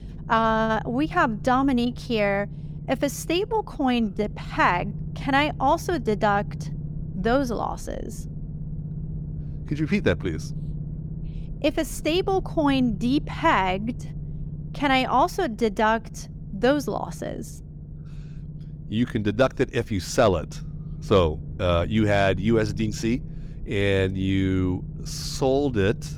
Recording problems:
low rumble; faint; throughout; 20 dB below the speech

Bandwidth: 18 kHz